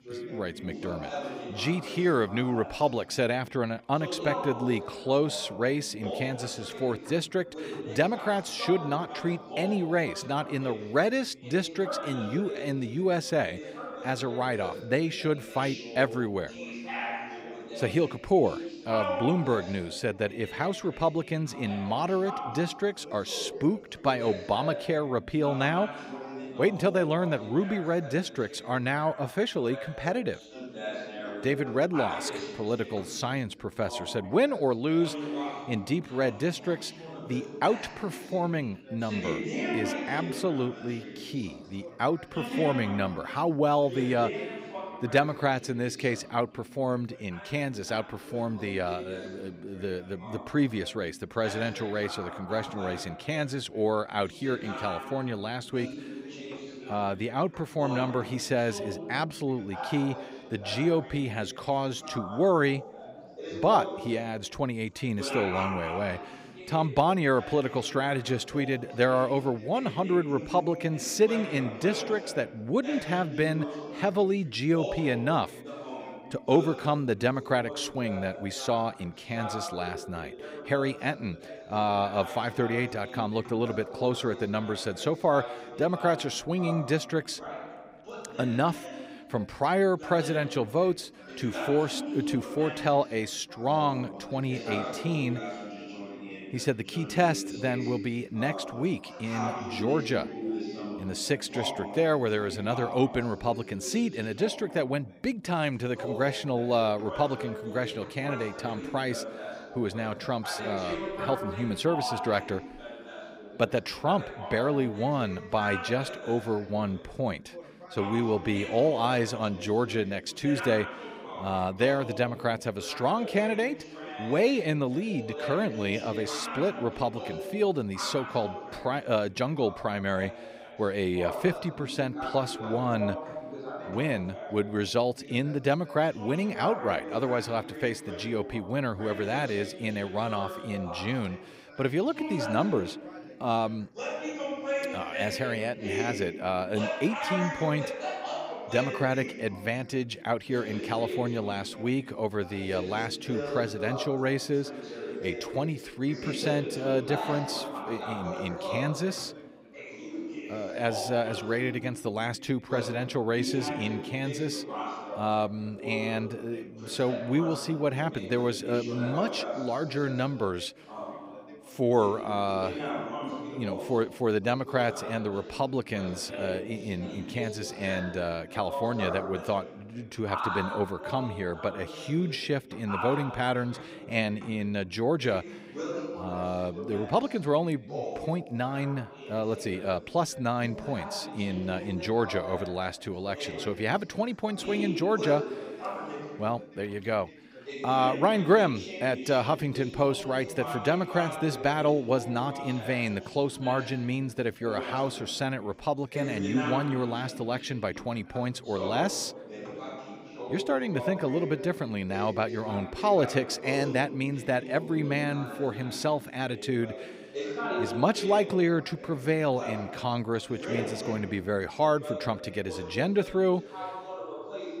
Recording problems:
background chatter; loud; throughout; 3 voices, 9 dB below the speech

